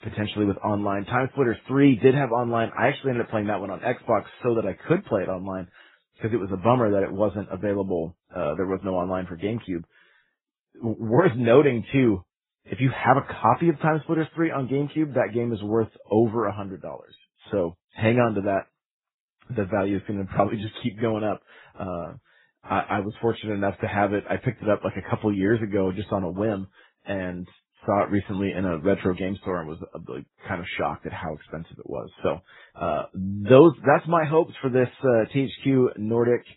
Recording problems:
garbled, watery; badly; nothing above 4 kHz

